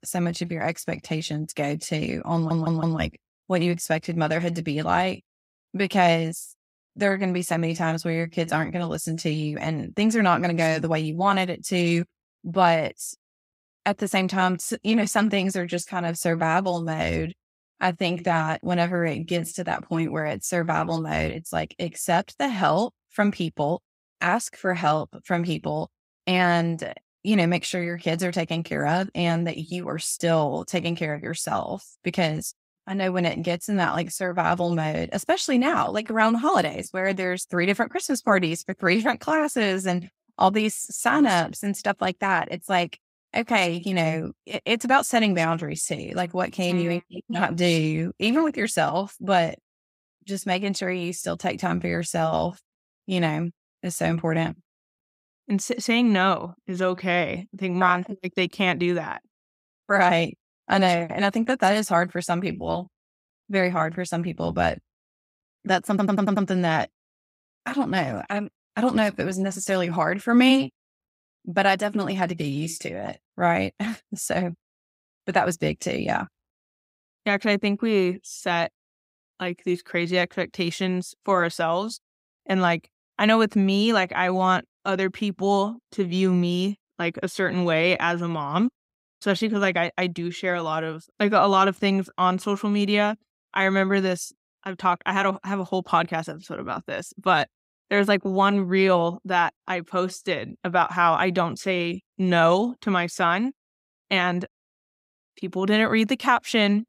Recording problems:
audio stuttering; at 2.5 s and at 1:06

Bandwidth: 15.5 kHz